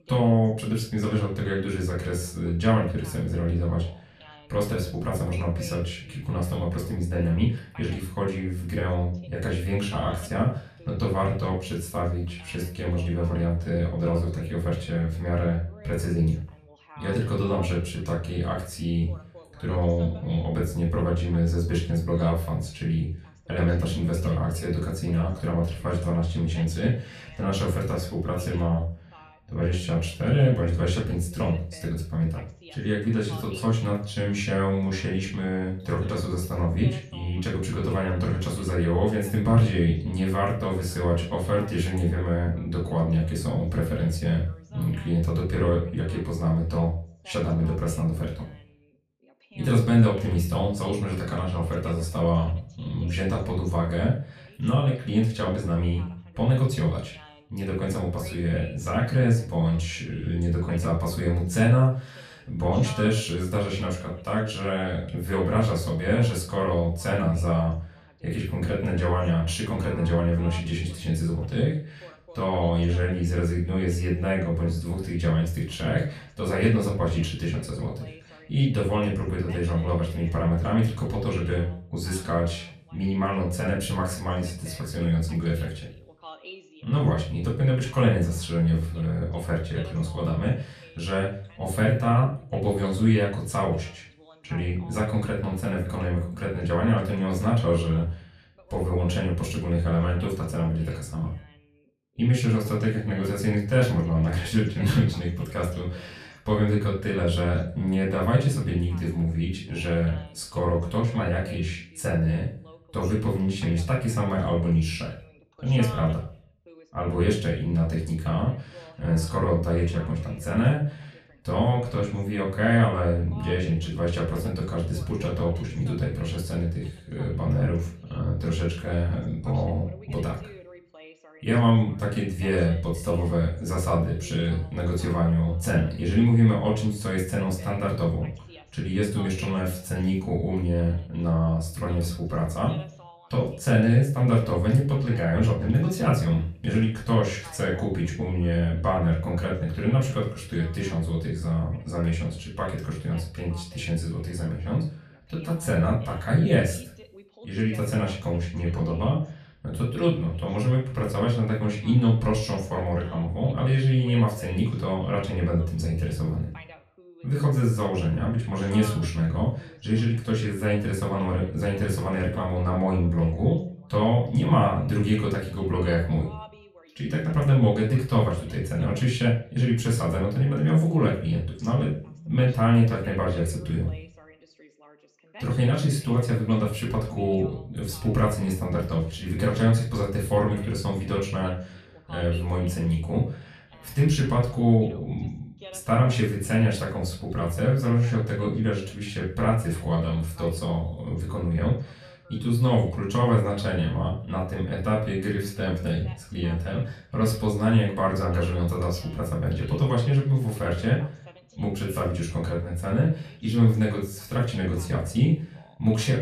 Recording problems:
off-mic speech; far
room echo; slight; dies away in 0.4 s
voice in the background; faint; throughout; 25 dB below the speech

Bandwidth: 14 kHz